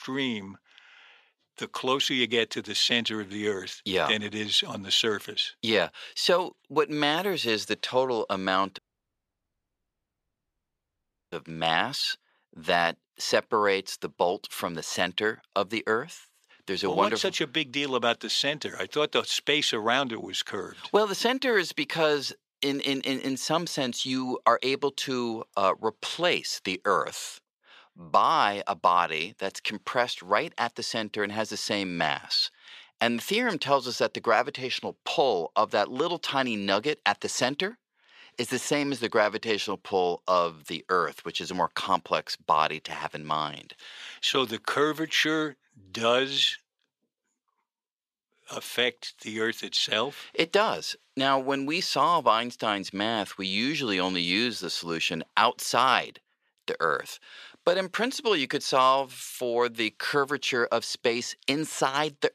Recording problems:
thin; somewhat; fading below 400 Hz
audio cutting out; at 9 s for 2.5 s

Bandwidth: 14.5 kHz